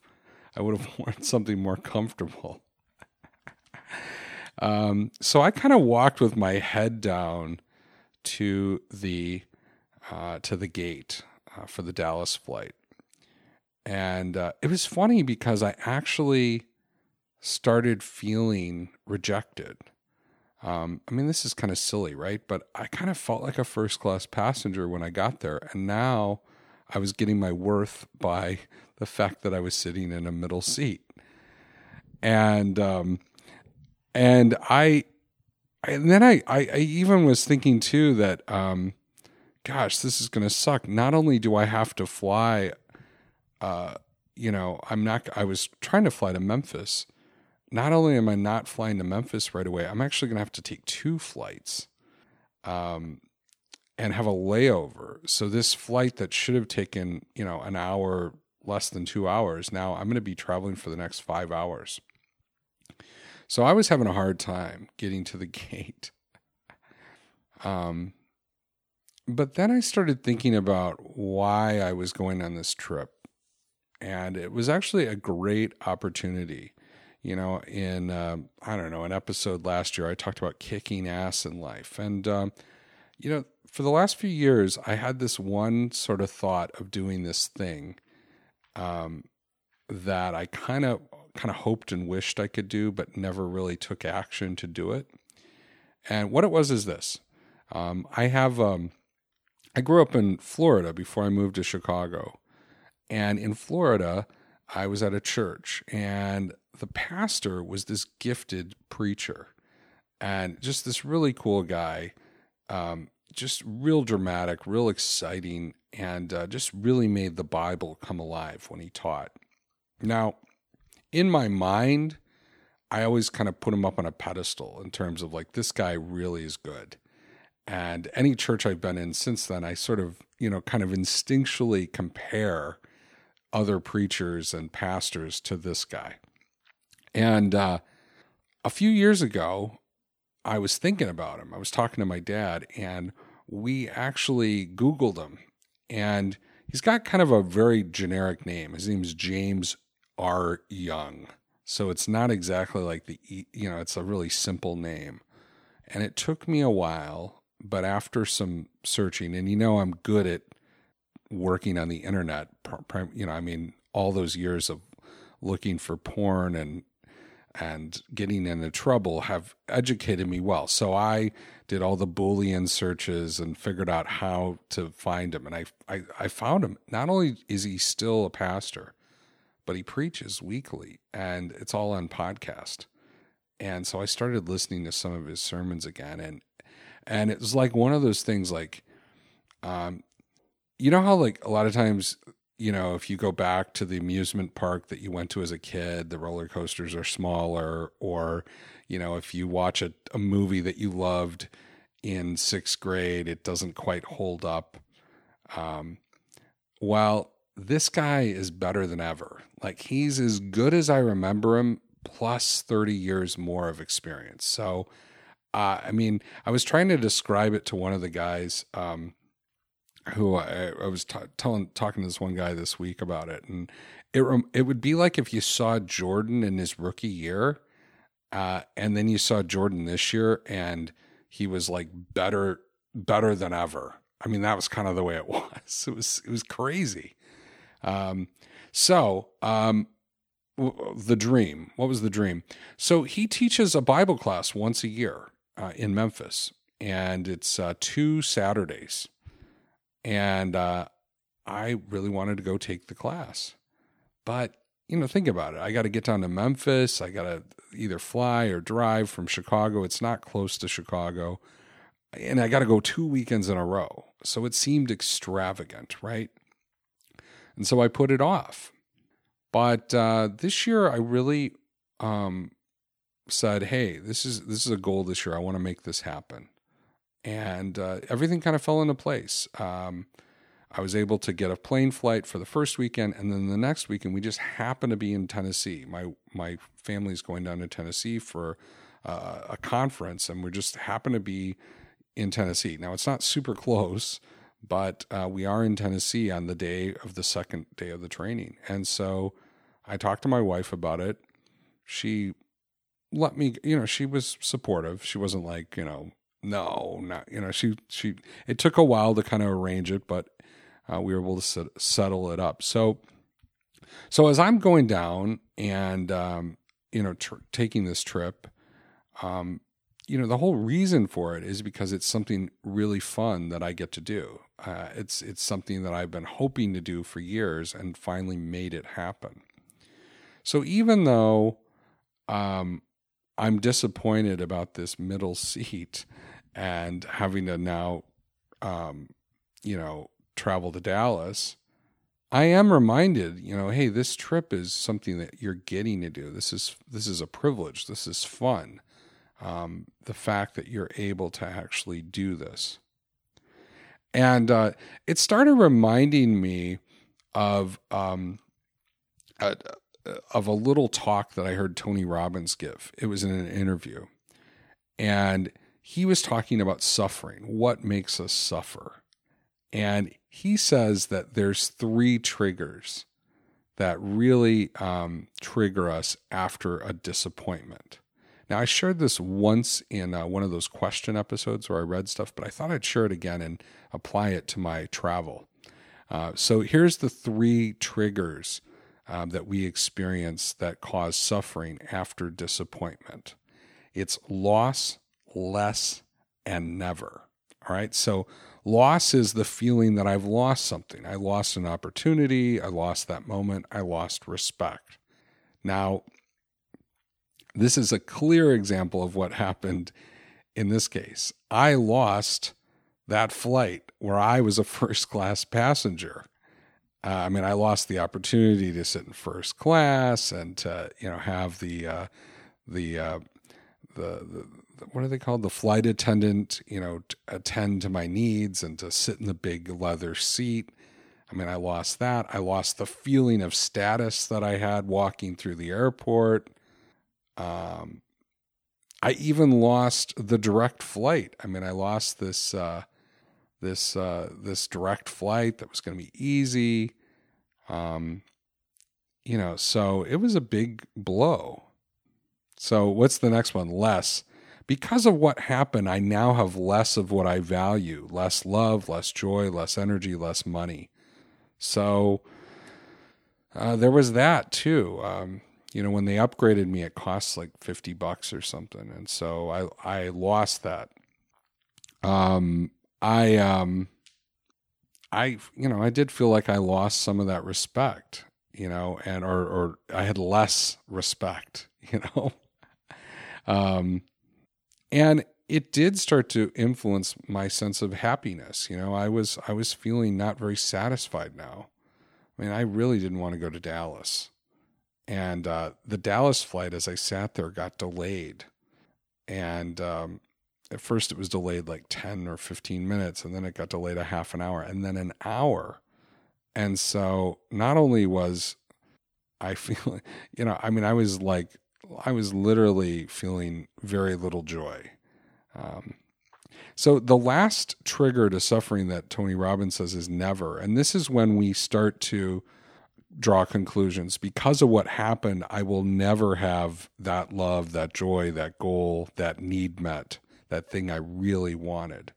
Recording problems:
none

